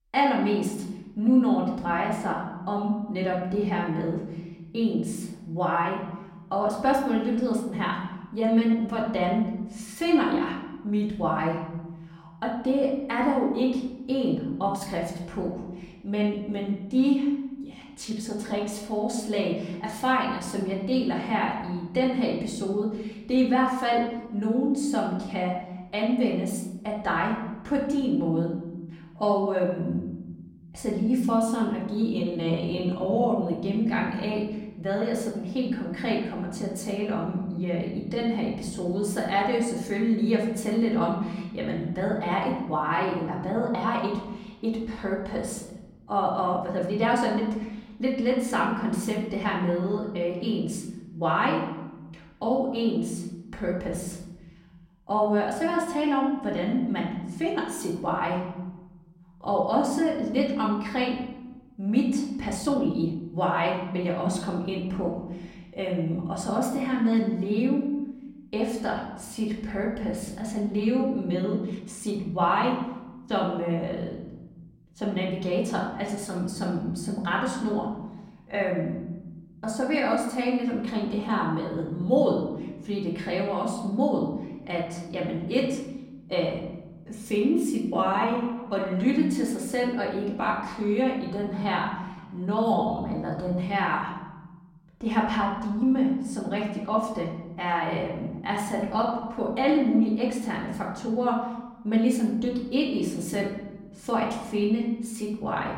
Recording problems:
off-mic speech; far
room echo; noticeable; dies away in 1.3 s
uneven, jittery; strongly; from 18 s to 1:39

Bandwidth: 16 kHz